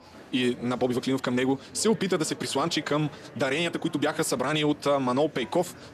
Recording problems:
wrong speed, natural pitch; too fast; 1.5 times normal speed
murmuring crowd; noticeable; throughout; 20 dB below the speech

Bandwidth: 14 kHz